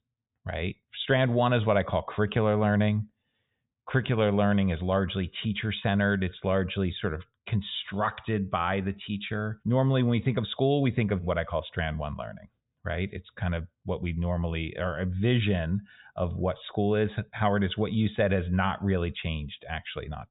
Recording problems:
high frequencies cut off; severe; nothing above 4 kHz

